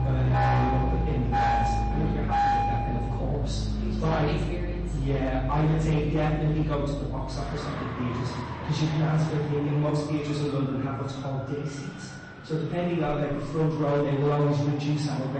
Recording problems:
off-mic speech; far
room echo; noticeable; dies away in 1 s
echo of what is said; faint; throughout; 120 ms later, 20 dB below the speech
distortion; slight; 9% of the sound clipped
garbled, watery; slightly; nothing above 8 kHz
traffic noise; loud; throughout; 2 dB below the speech
abrupt cut into speech; at the end

